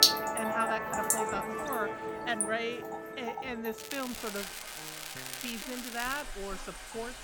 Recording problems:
background music; very loud; throughout; as loud as the speech
rain or running water; very loud; throughout; 1 dB above the speech
crackling; loud; at 4 s and from 4.5 to 6 s; 4 dB below the speech

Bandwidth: 18 kHz